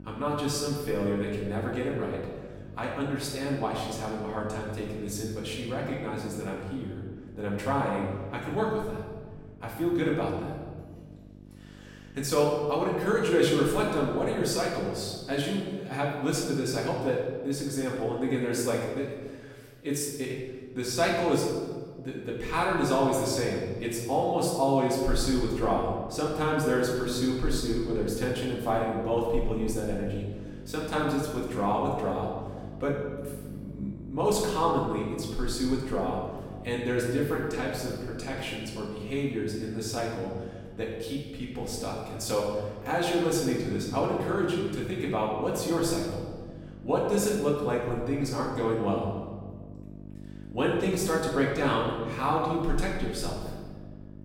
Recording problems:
off-mic speech; far
room echo; noticeable; dies away in 1.4 s
electrical hum; faint; until 14 s and from 25 s on; 50 Hz, 25 dB below the speech

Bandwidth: 16.5 kHz